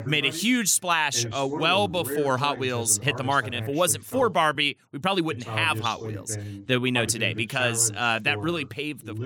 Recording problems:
voice in the background; noticeable; throughout; 10 dB below the speech
uneven, jittery; strongly; from 1 to 8.5 s

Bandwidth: 17 kHz